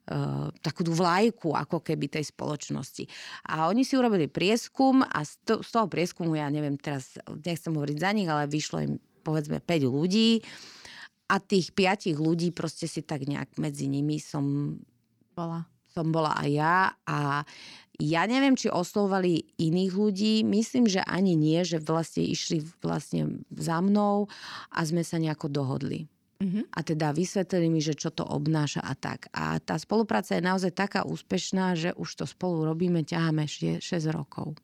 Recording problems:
none

